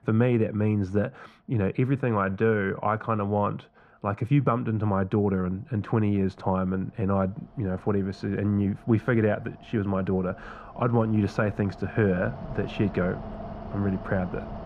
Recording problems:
muffled; very; fading above 2.5 kHz
machinery noise; noticeable; throughout; 15 dB below the speech

